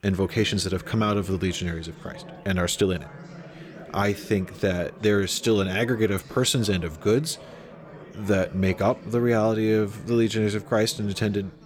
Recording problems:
chatter from many people; noticeable; throughout; 20 dB below the speech

